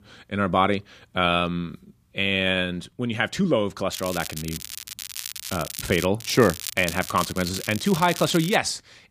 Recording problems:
crackling; loud; from 4 to 6 s and from 6 to 8.5 s; 10 dB below the speech

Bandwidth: 15 kHz